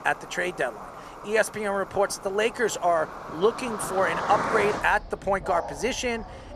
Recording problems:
animal sounds; loud; throughout; 8 dB below the speech

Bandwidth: 14.5 kHz